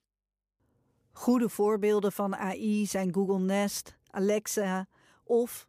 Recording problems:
none

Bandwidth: 15 kHz